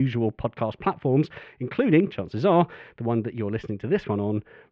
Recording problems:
muffled; very; fading above 2.5 kHz
abrupt cut into speech; at the start

